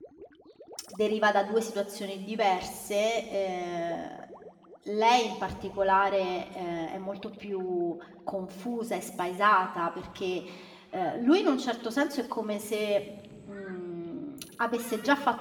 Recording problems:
room echo; slight; dies away in 2 s
off-mic speech; somewhat distant
rain or running water; faint; throughout; 25 dB below the speech

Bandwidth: 18.5 kHz